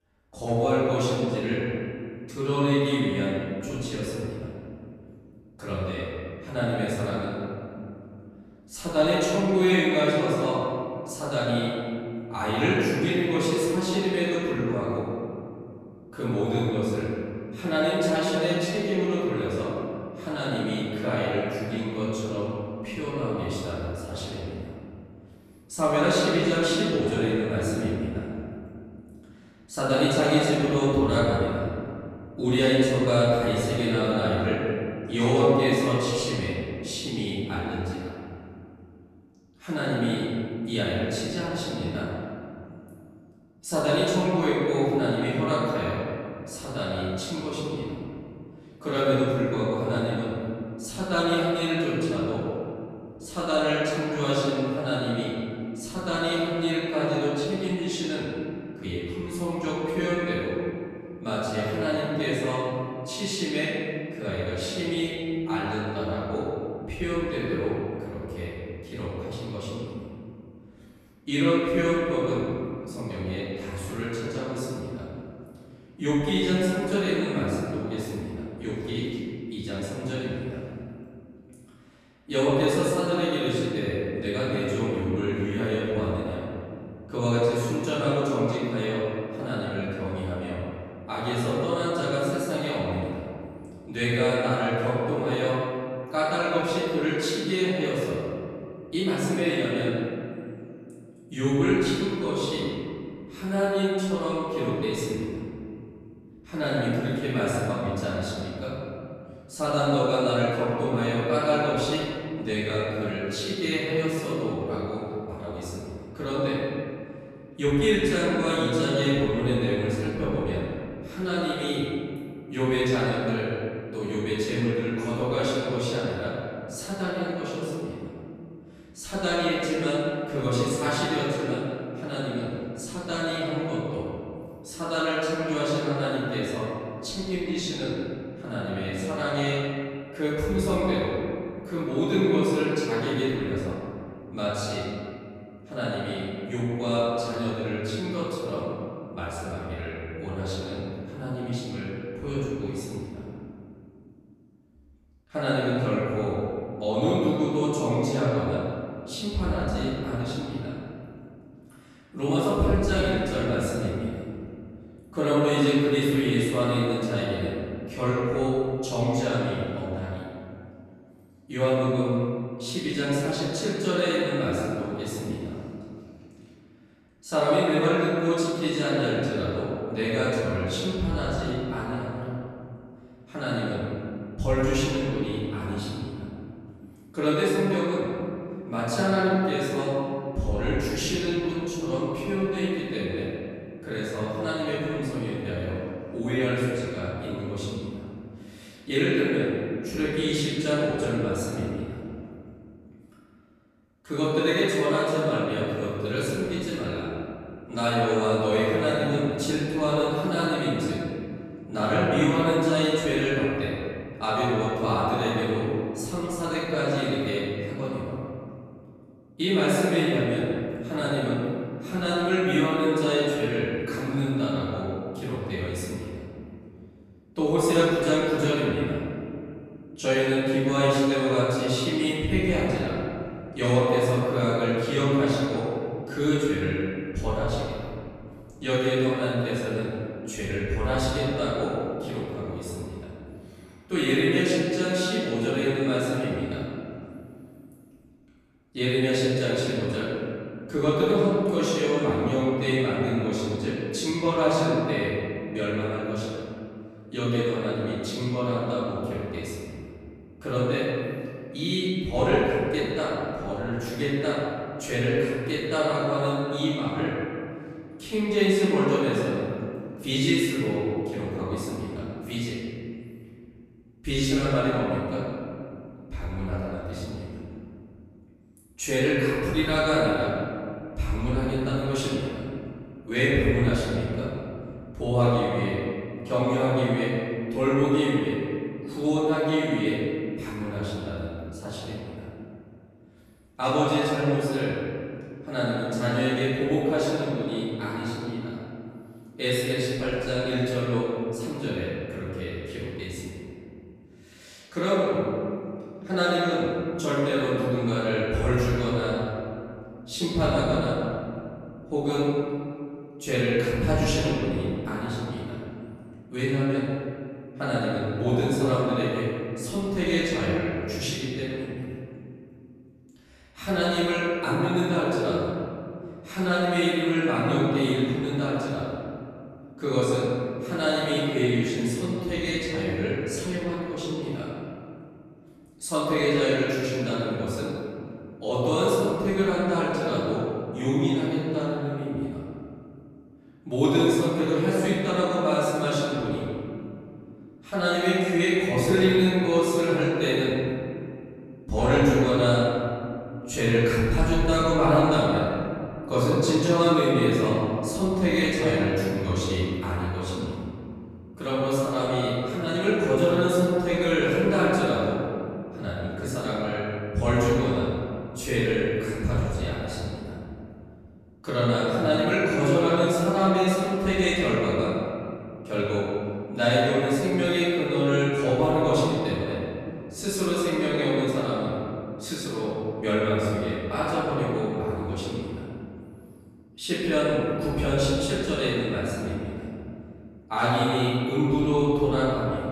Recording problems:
room echo; strong; dies away in 2.3 s
off-mic speech; far

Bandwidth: 14 kHz